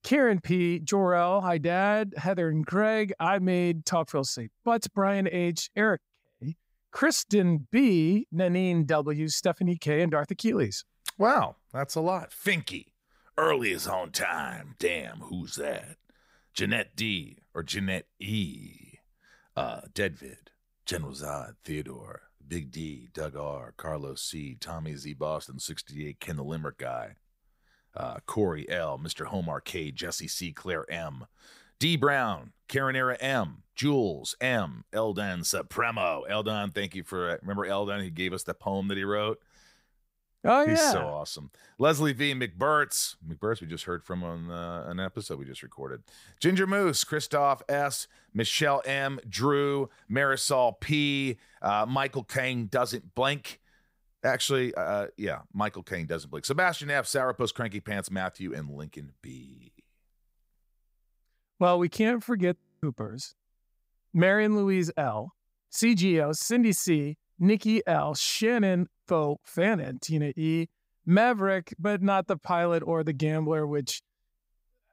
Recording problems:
audio freezing; at 1:03

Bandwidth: 15.5 kHz